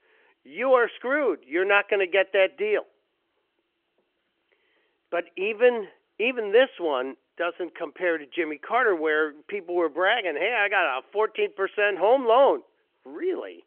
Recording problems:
phone-call audio

